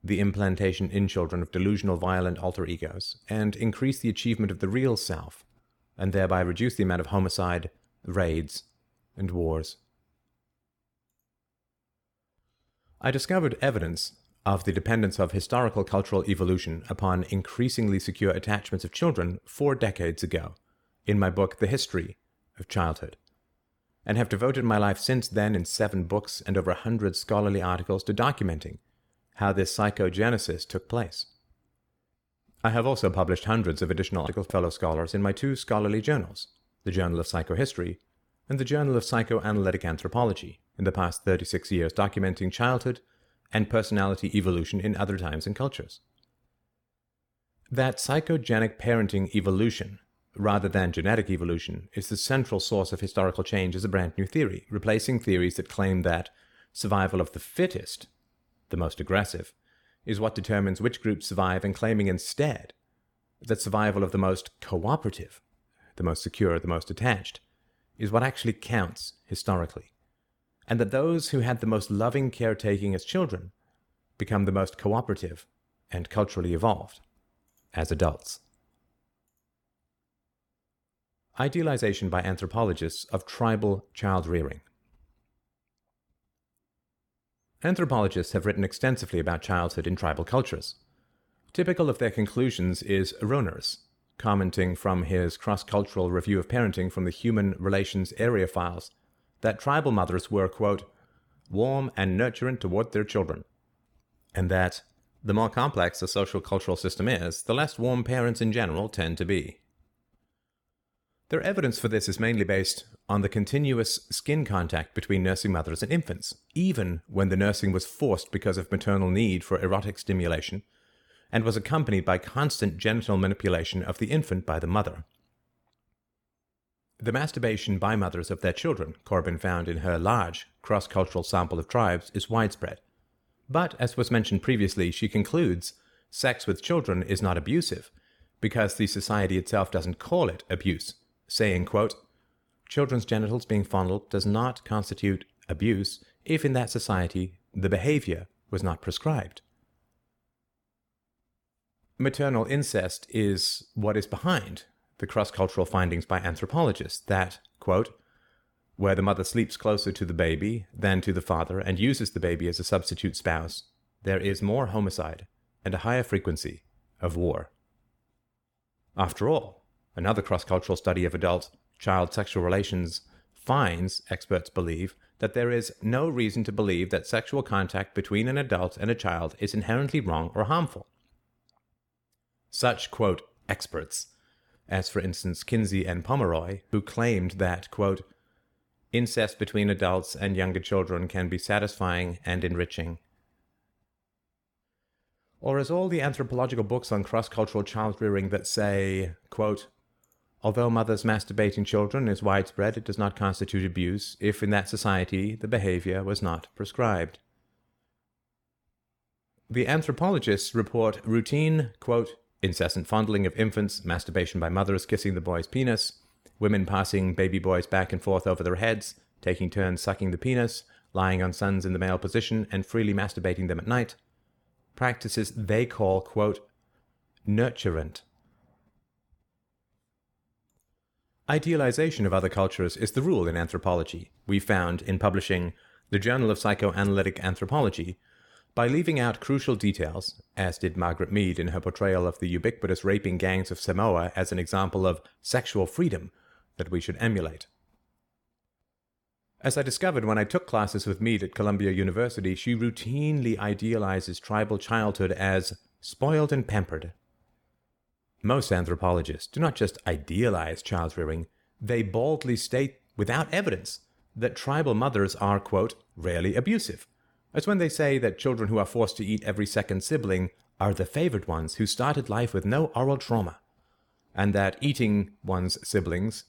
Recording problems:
none

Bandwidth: 18 kHz